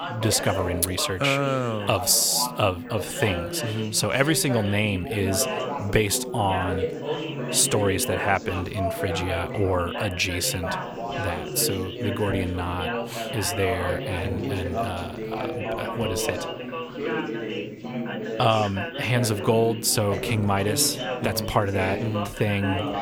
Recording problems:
background chatter; loud; throughout; 4 voices, 6 dB below the speech

